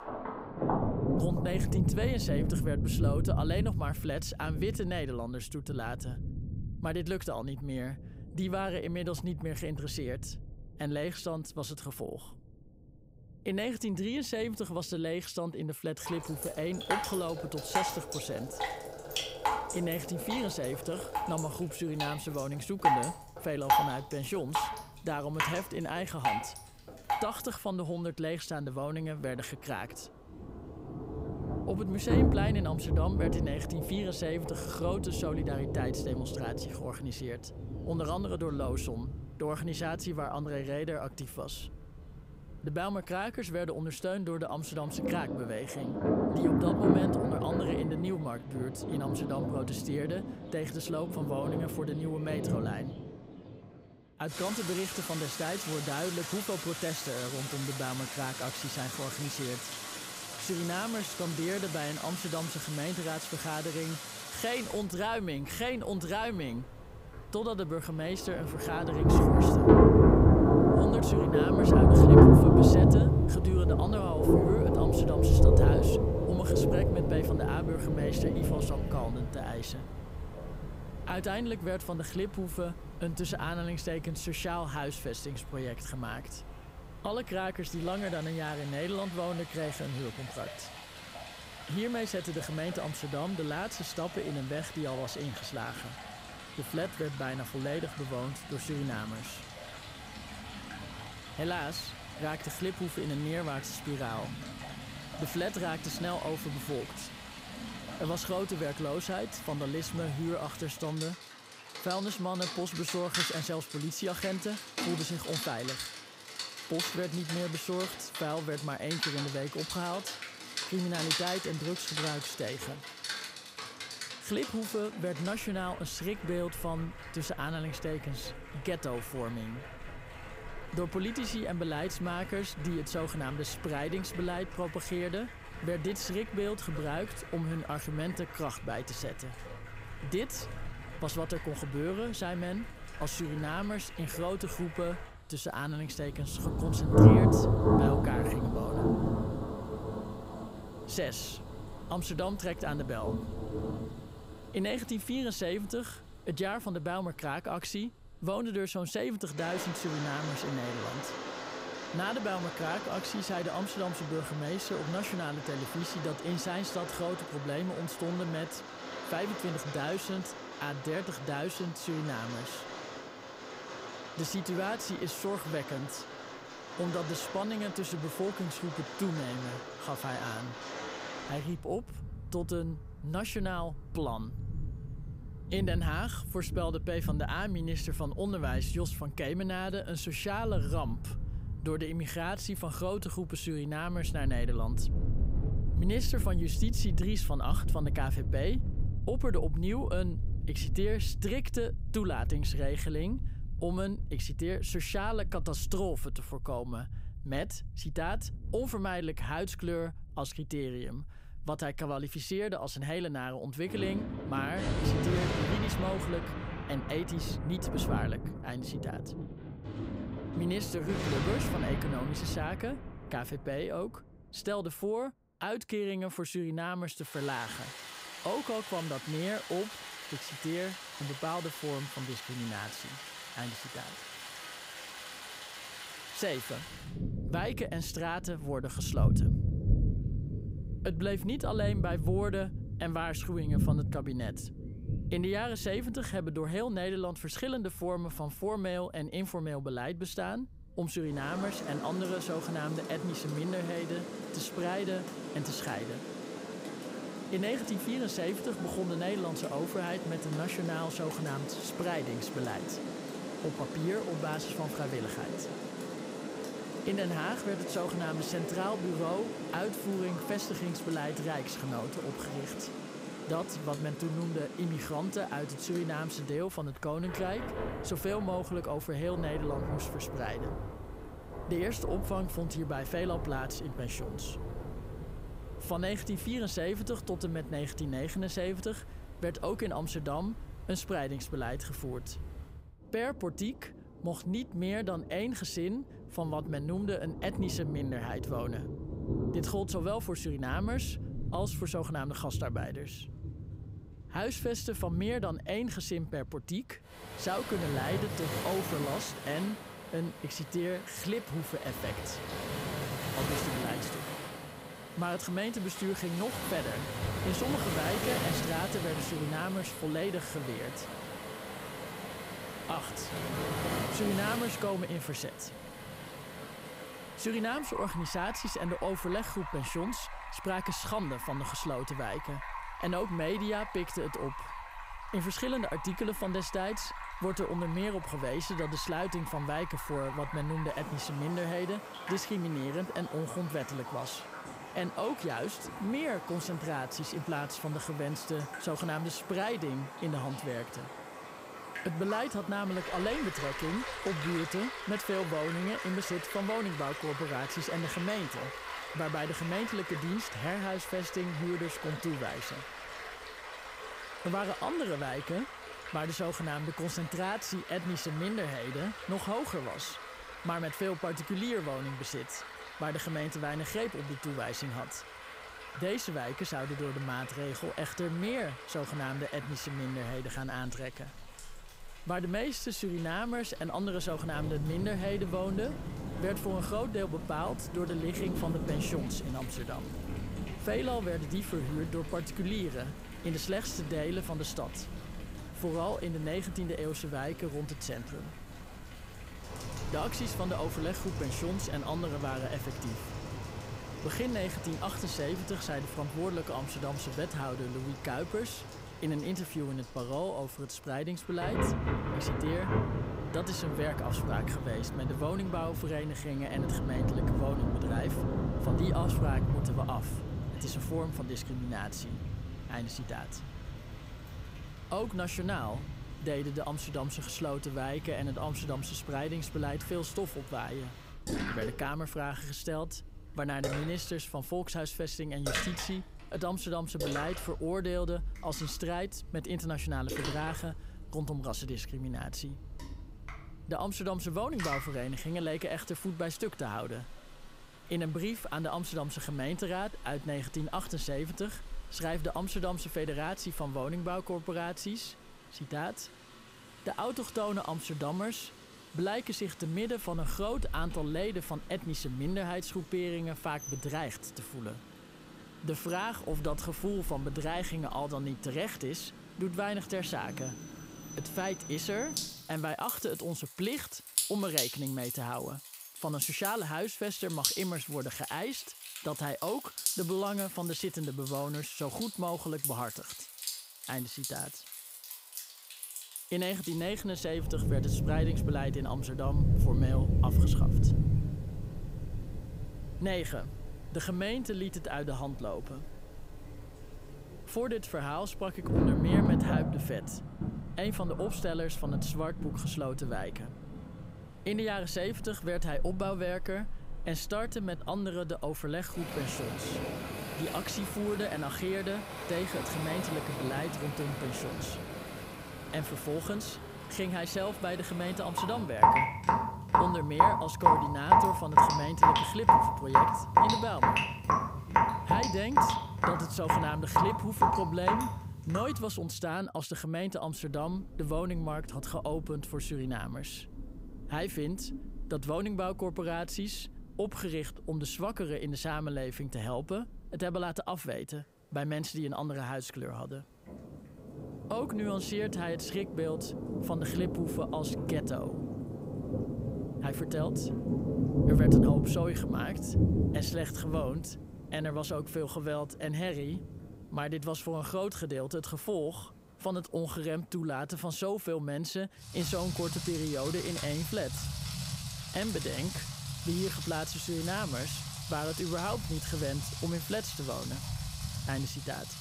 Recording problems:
rain or running water; very loud; throughout; 2 dB above the speech

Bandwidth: 15.5 kHz